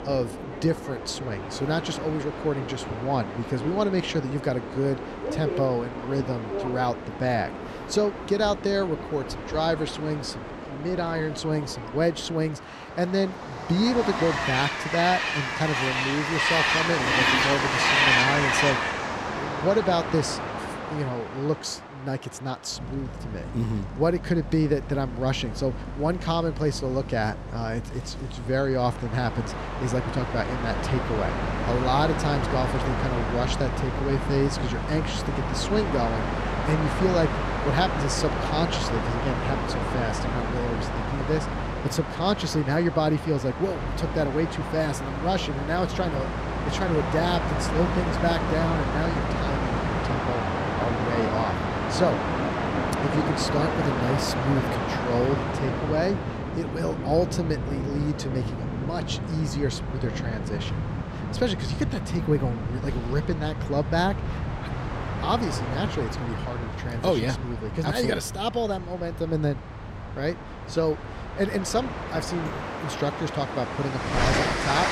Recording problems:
train or aircraft noise; loud; throughout; 1 dB below the speech

